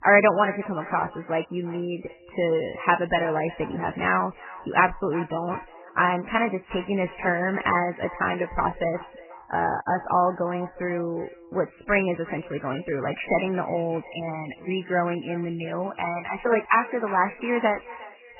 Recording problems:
garbled, watery; badly; nothing above 3 kHz
echo of what is said; noticeable; throughout; 360 ms later, 15 dB below the speech

